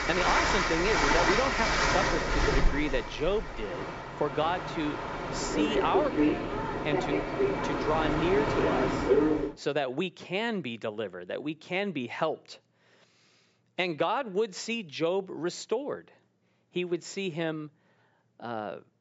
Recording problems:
high frequencies cut off; noticeable; nothing above 8 kHz
train or aircraft noise; very loud; until 9.5 s; 3 dB above the speech

